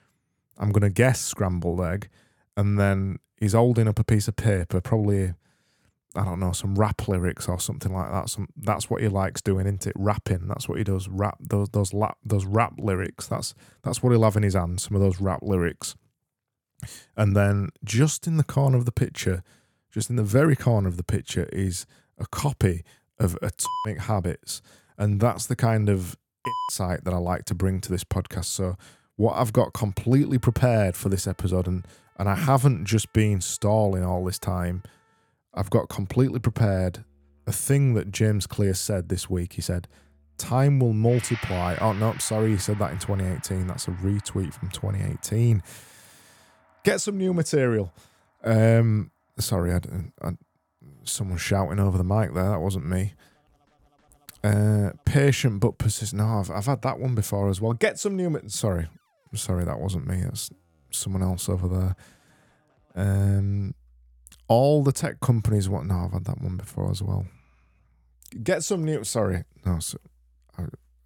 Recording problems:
background music; noticeable; from 30 s on; 20 dB below the speech

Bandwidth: 18 kHz